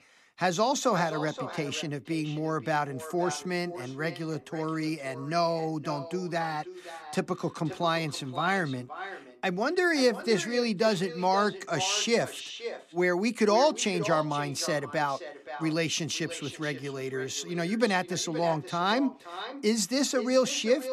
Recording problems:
echo of what is said; strong; throughout; 520 ms later, 10 dB below the speech

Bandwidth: 13.5 kHz